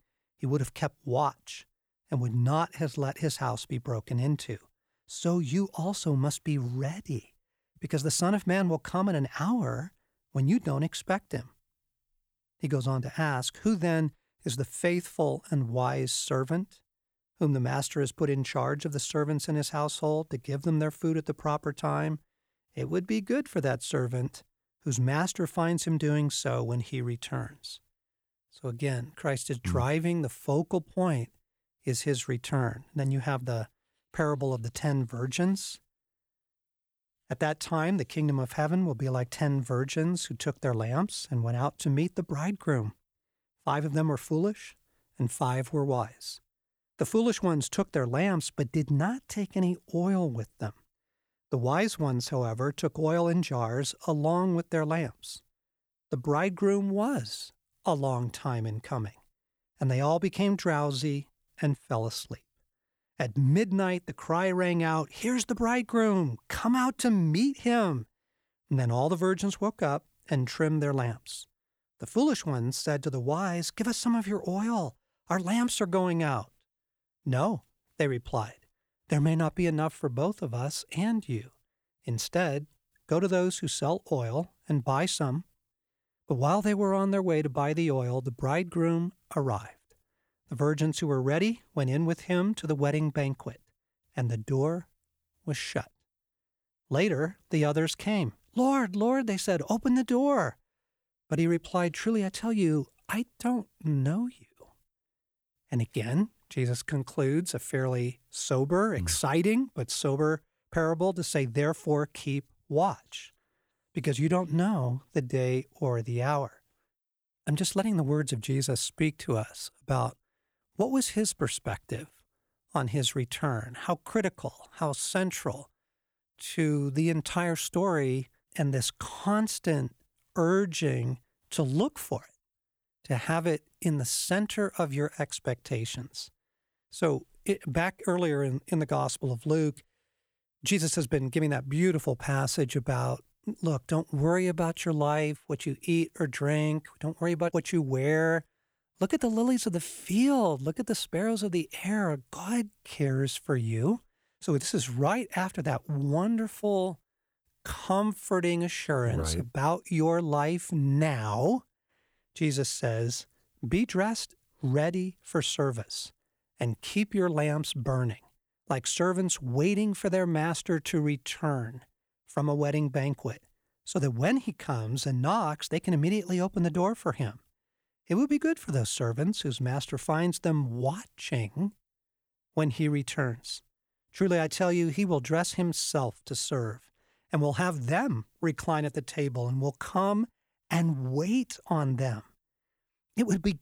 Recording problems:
none

